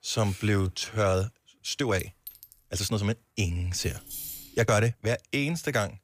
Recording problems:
uneven, jittery; strongly; from 0.5 to 5 s
clattering dishes; faint; at 2 s; peak 15 dB below the speech
jangling keys; noticeable; at 4 s; peak 7 dB below the speech

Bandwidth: 15 kHz